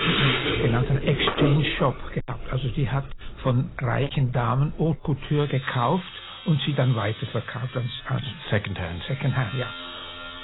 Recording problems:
garbled, watery; badly; nothing above 4 kHz
distortion; slight; 6% of the sound clipped
household noises; loud; throughout; 5 dB below the speech

